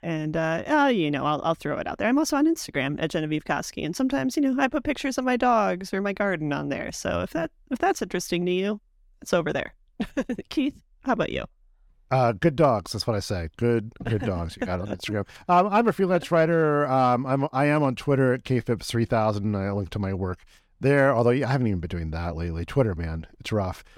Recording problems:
none

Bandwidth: 17.5 kHz